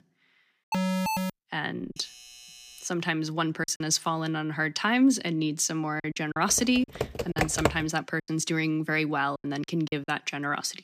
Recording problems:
choppy; very; 7% of the speech affected
alarm; loud; at 0.5 s; peak level with the speech
doorbell; faint; from 2 to 3 s; peak 20 dB below the speech
keyboard typing; loud; from 6.5 to 8 s; peak level with the speech

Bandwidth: 15 kHz